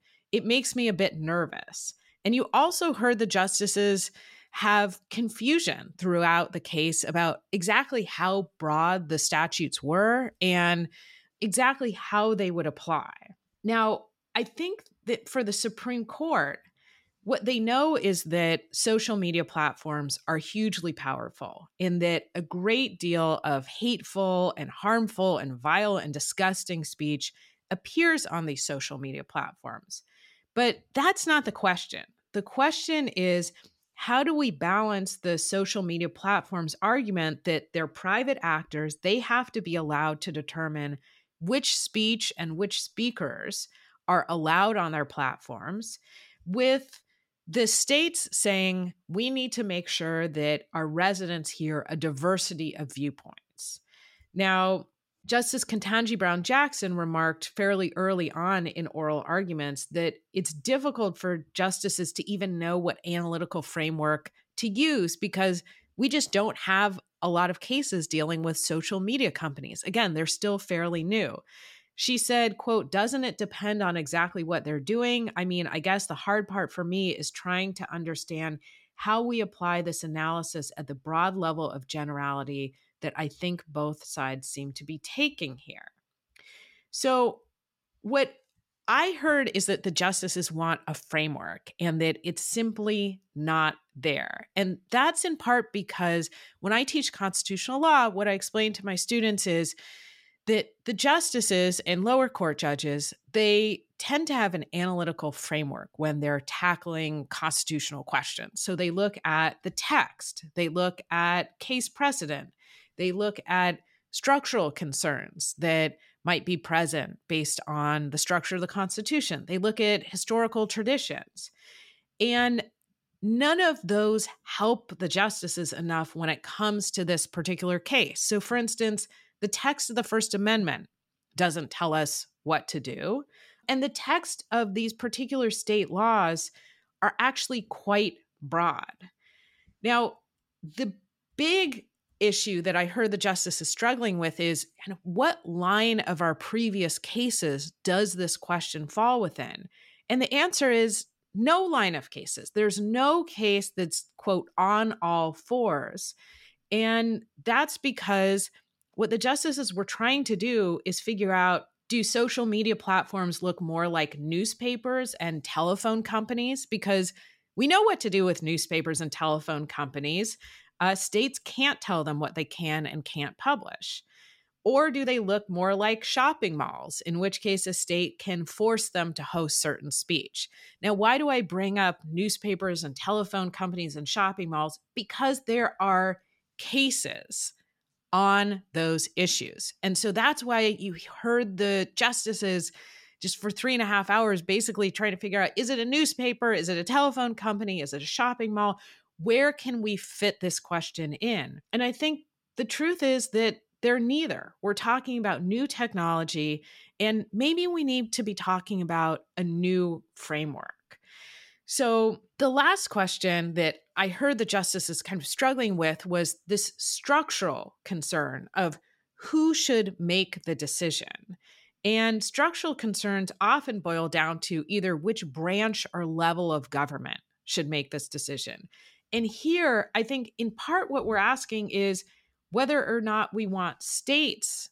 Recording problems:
none

